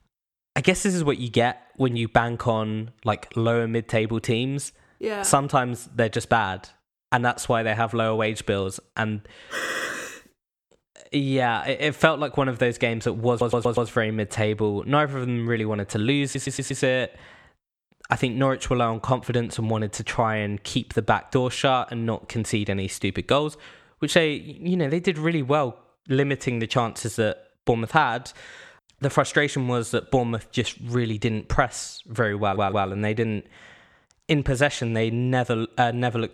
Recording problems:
audio stuttering; 4 times, first at 9.5 s

